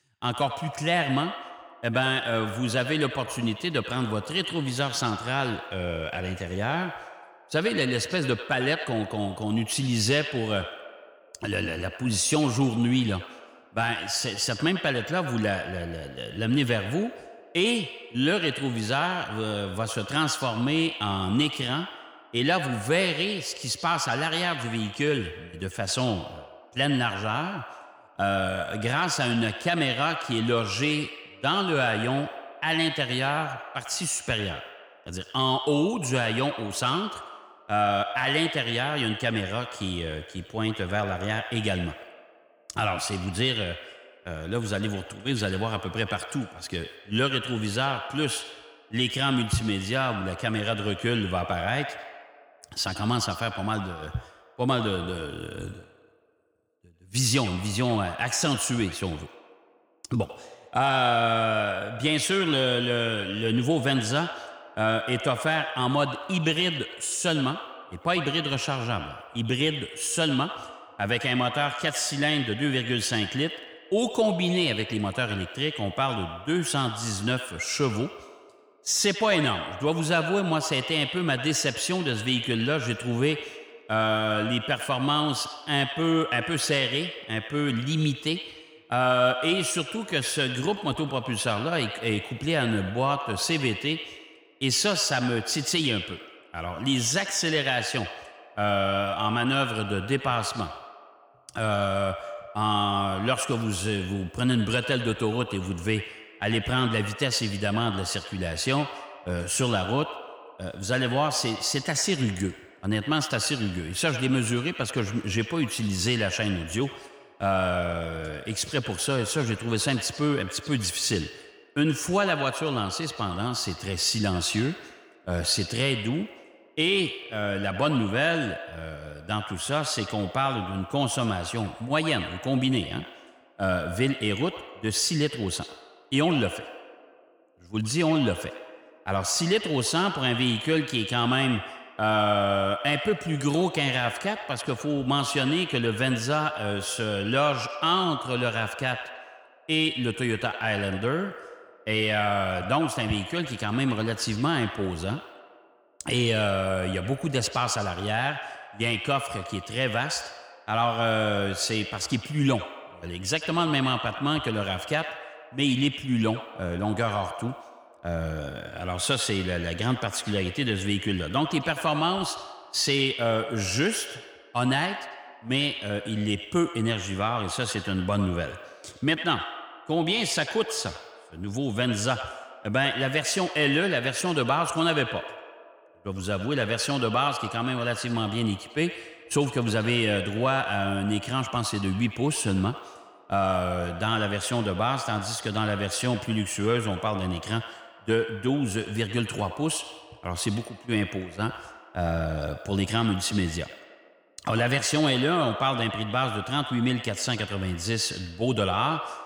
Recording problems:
echo of what is said; strong; throughout; 90 ms later, 9 dB below the speech

